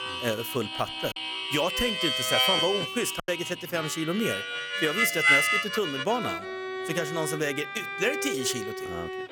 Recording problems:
background music; very loud; throughout; 2 dB above the speech
background chatter; faint; throughout; 4 voices, 25 dB below the speech
choppy; occasionally; at 1 s and at 3 s; 3% of the speech affected

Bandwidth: 18 kHz